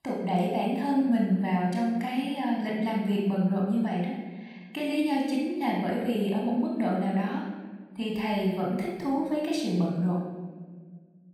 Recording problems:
off-mic speech; far
room echo; noticeable; dies away in 1.2 s

